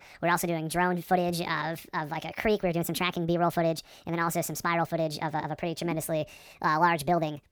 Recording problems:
wrong speed and pitch; too fast and too high; 1.5 times normal speed

